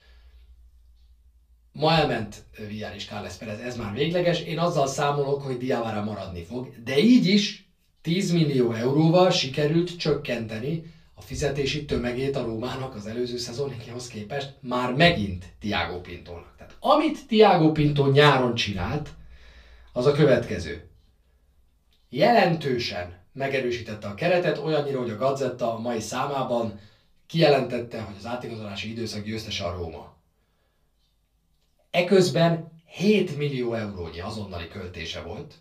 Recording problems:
off-mic speech; far
room echo; very slight; dies away in 0.3 s

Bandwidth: 15 kHz